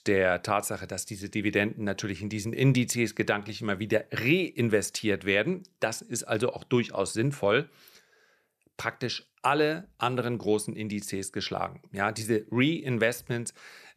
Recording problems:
none

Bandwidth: 14 kHz